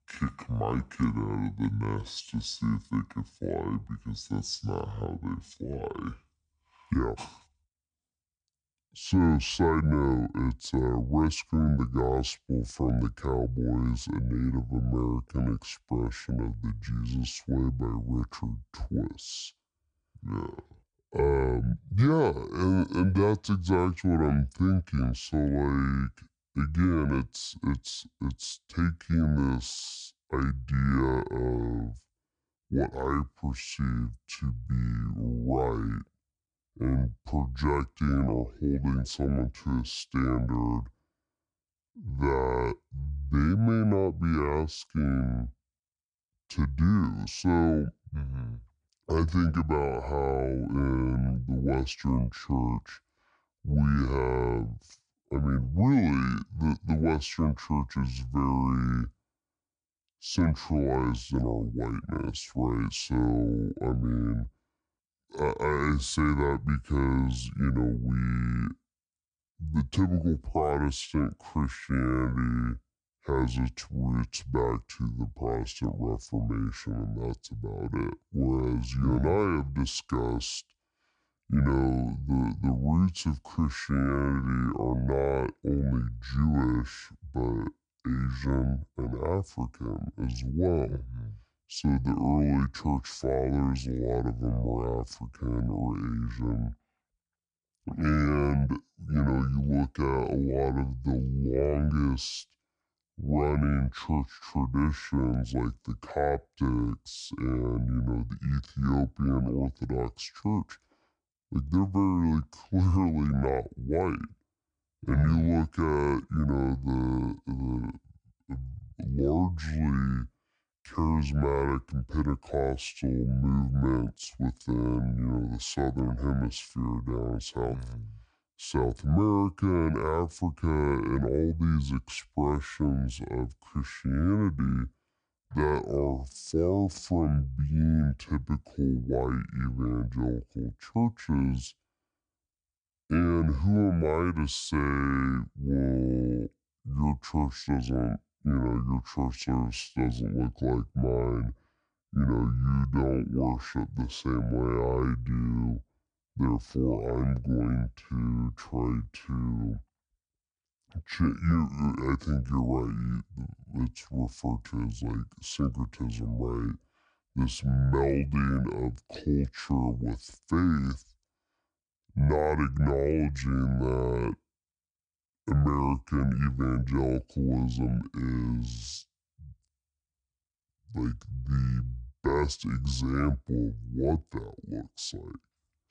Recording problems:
wrong speed and pitch; too slow and too low; 0.6 times normal speed

